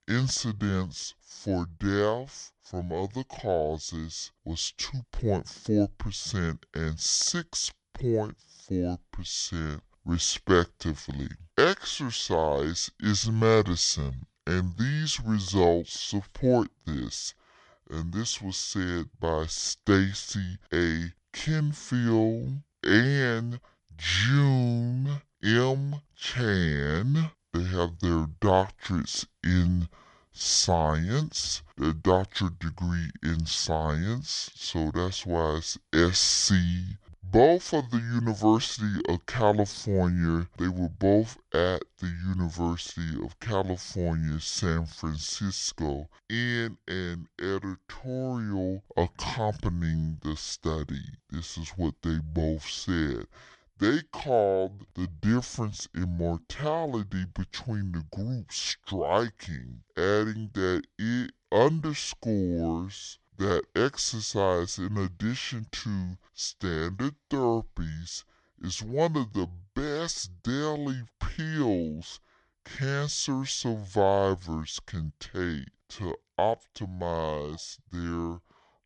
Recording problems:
wrong speed and pitch; too slow and too low; 0.6 times normal speed

